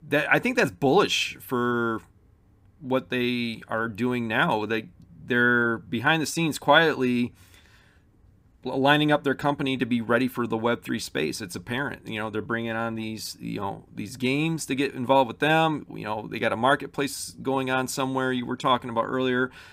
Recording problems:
none

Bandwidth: 15.5 kHz